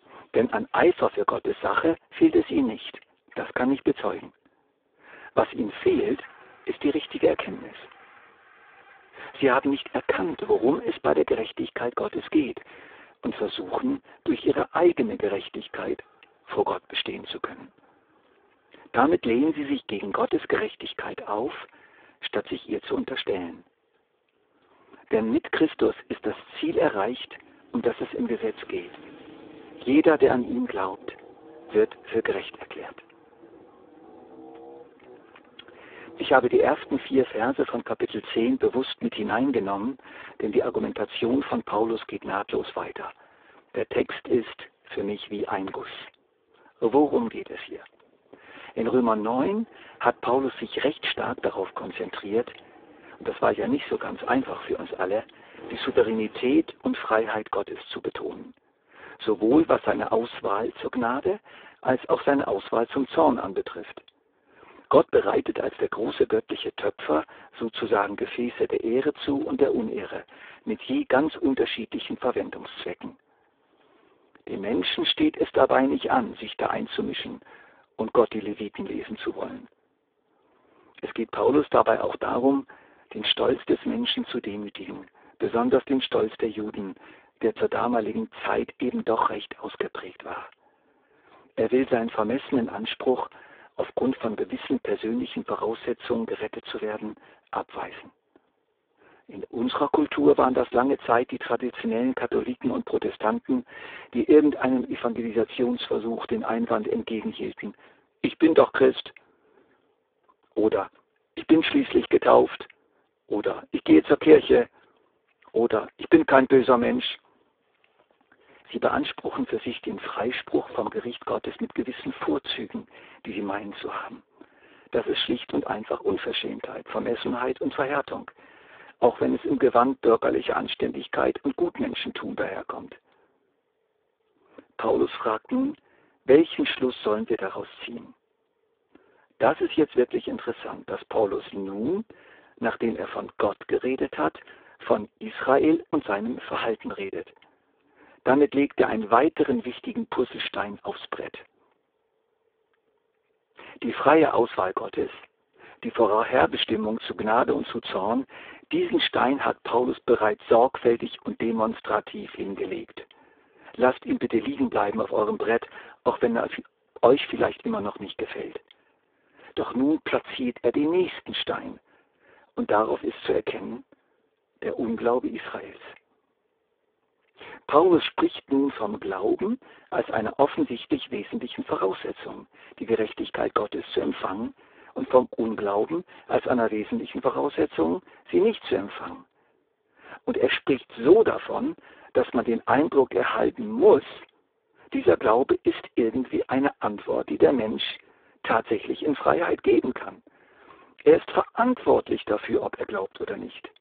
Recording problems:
phone-call audio; poor line; nothing above 3.5 kHz
traffic noise; faint; until 57 s; 25 dB below the speech

